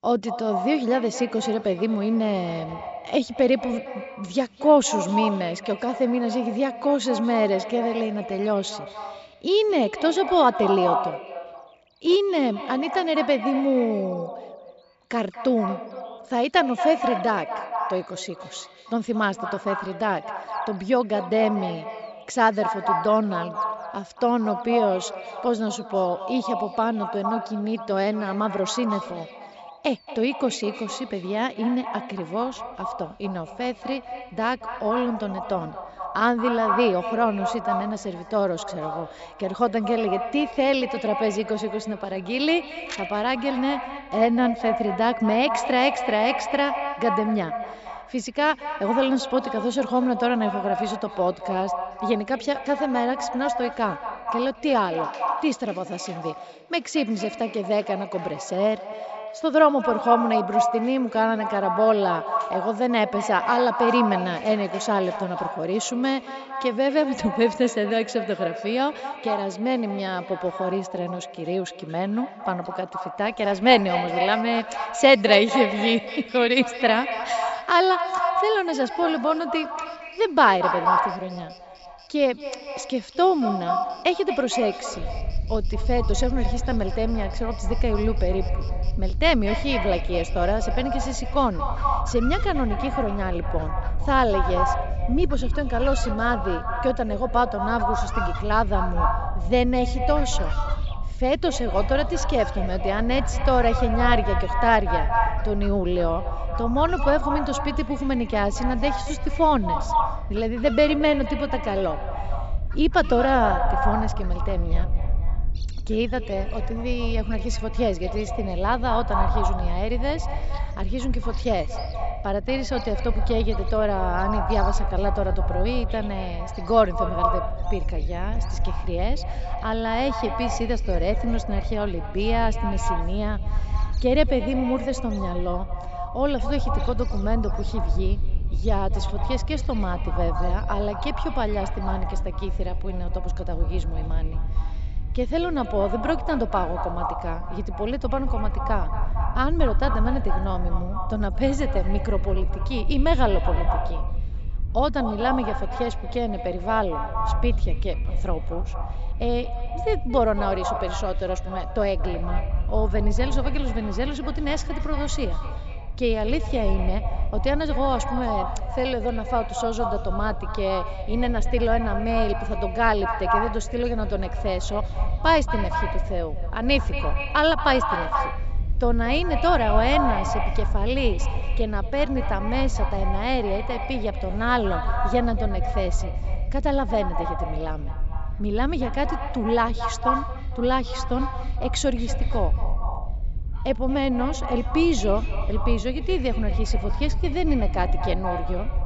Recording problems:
echo of what is said; strong; throughout; 230 ms later, 6 dB below the speech
high frequencies cut off; noticeable; nothing above 8 kHz
wind noise on the microphone; occasional gusts; from 1:25 on; 25 dB below the speech
animal sounds; faint; throughout; 25 dB below the speech

